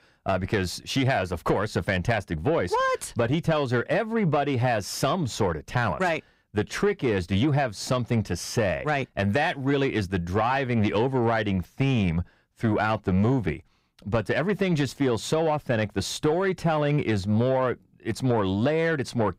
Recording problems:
distortion; slight; 10 dB below the speech

